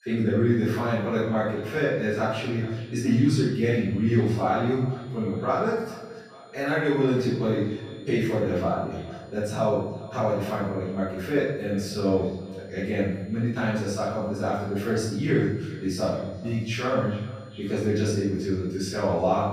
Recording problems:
room echo; strong; dies away in 0.9 s
off-mic speech; far
echo of what is said; noticeable; throughout; 420 ms later, 20 dB below the speech
high-pitched whine; faint; throughout; 4 kHz, 35 dB below the speech

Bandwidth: 15 kHz